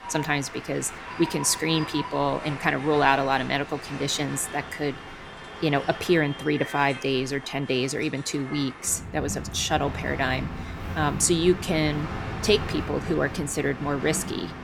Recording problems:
train or aircraft noise; noticeable; throughout; 10 dB below the speech

